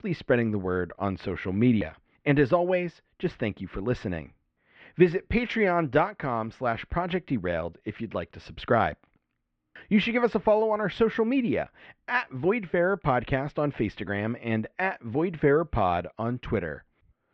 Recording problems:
muffled; very; fading above 2.5 kHz

